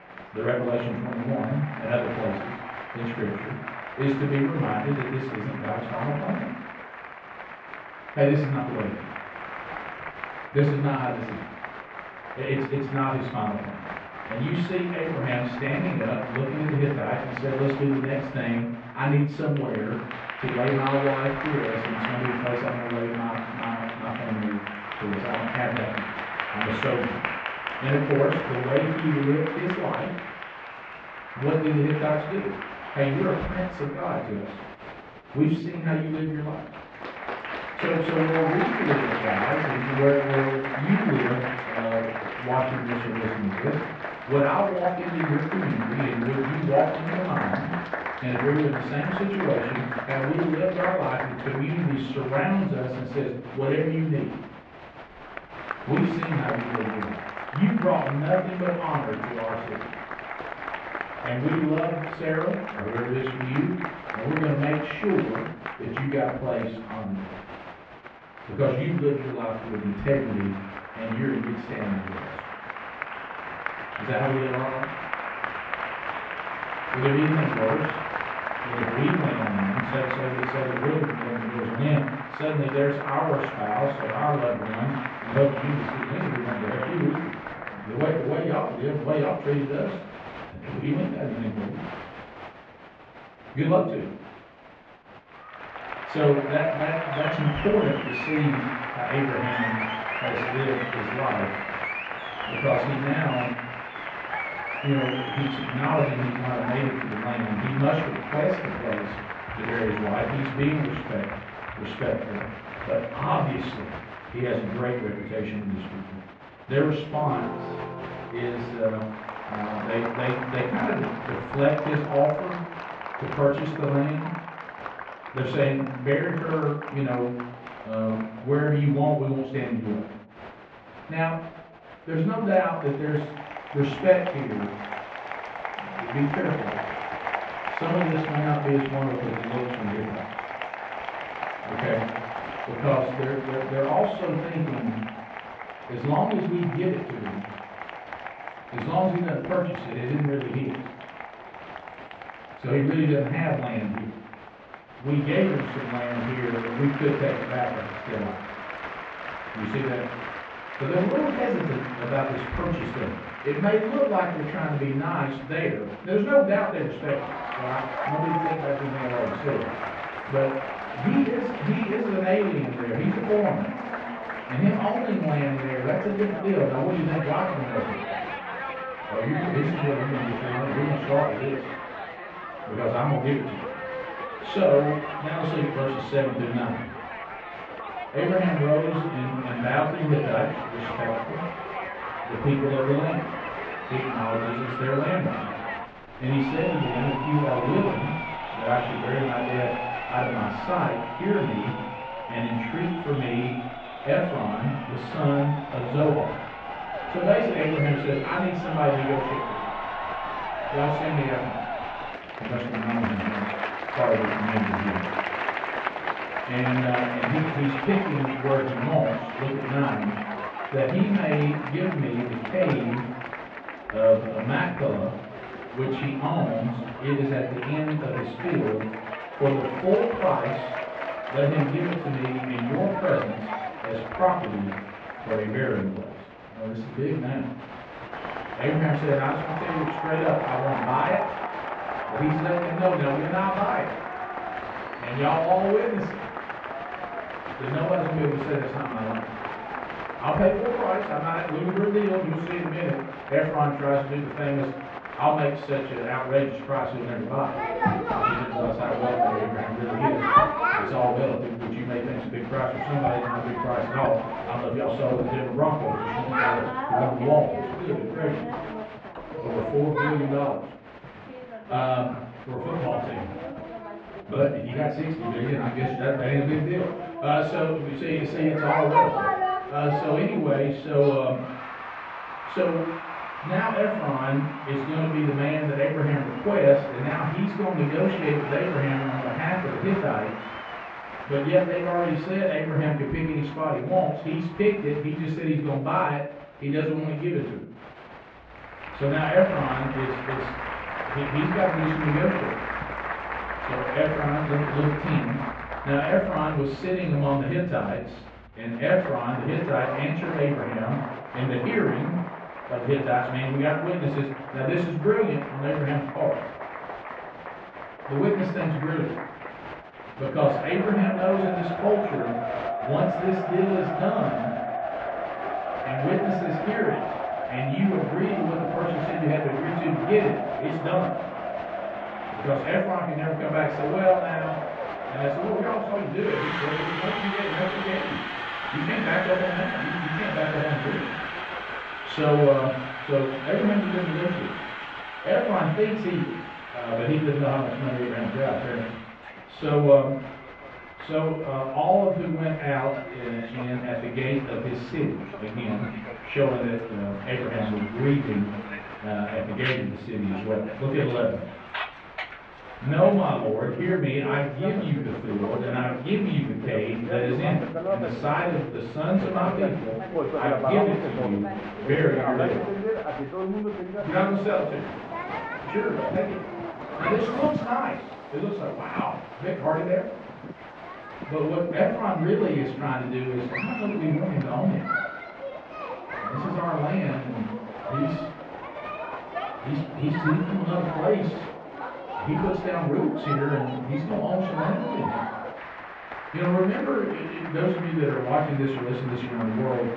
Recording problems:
off-mic speech; far
muffled; very; fading above 2.5 kHz
room echo; noticeable; dies away in 0.5 s
crowd noise; loud; throughout; 7 dB below the speech

